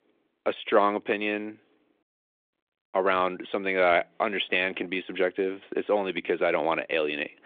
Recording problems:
phone-call audio

